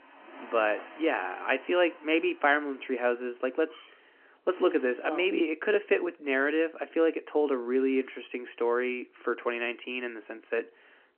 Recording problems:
phone-call audio; nothing above 3 kHz
traffic noise; faint; until 5 s; 20 dB below the speech

